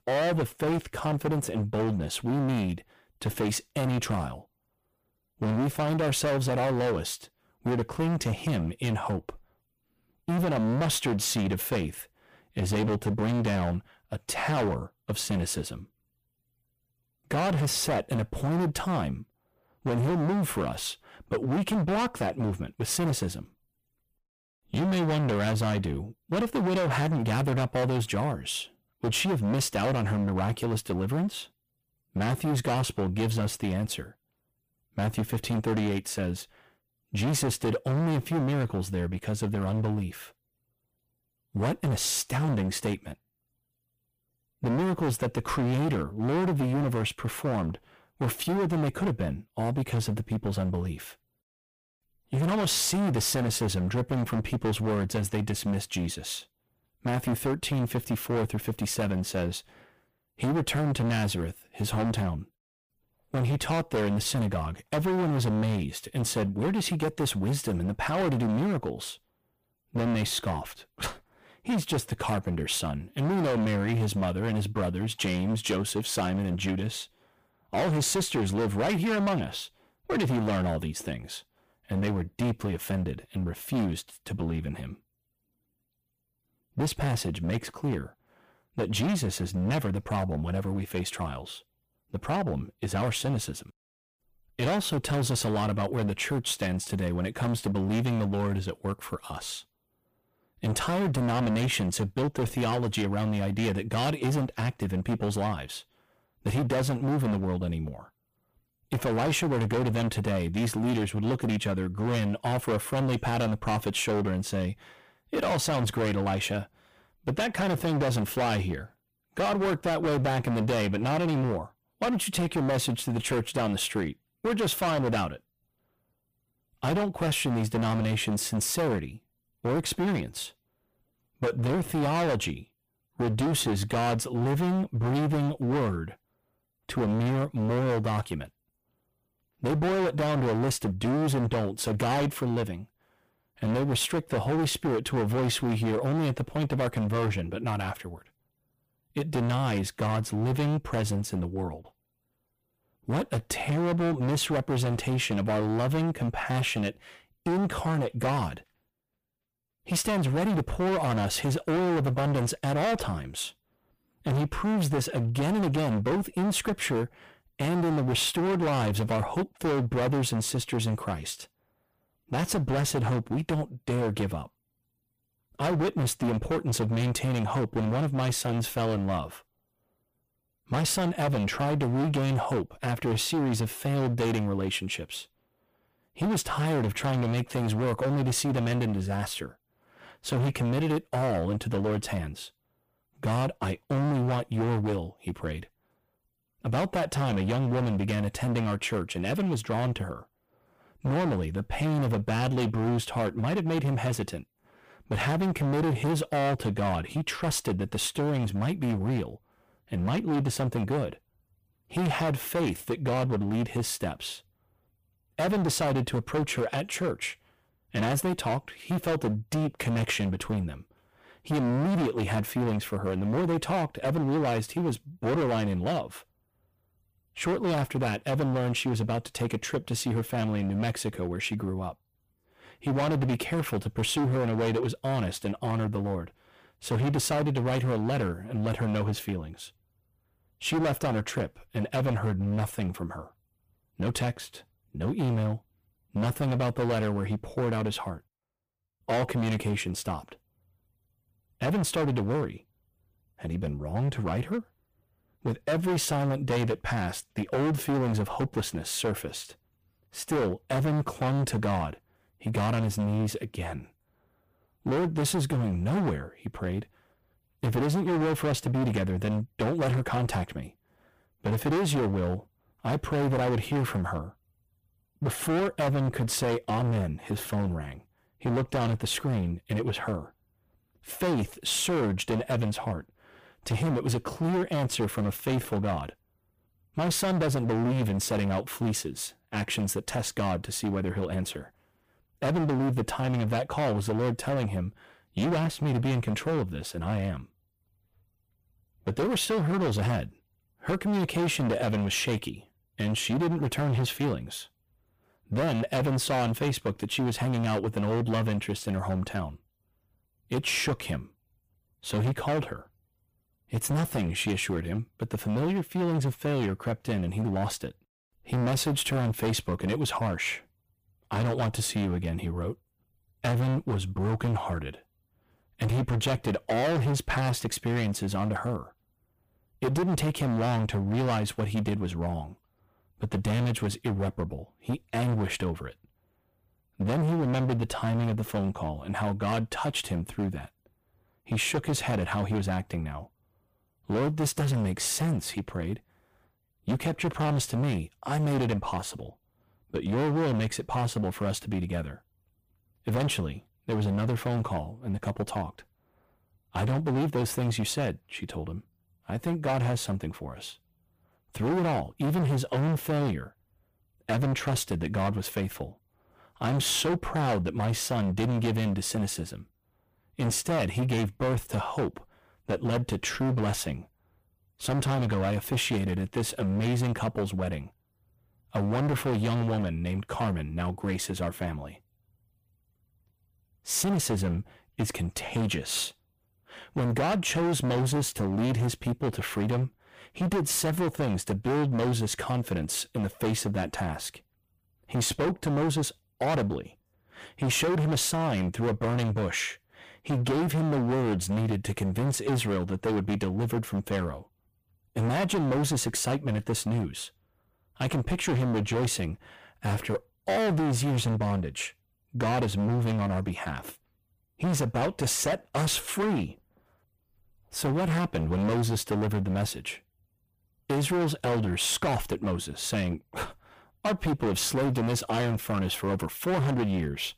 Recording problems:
distortion; heavy; 20% of the sound clipped

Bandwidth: 15 kHz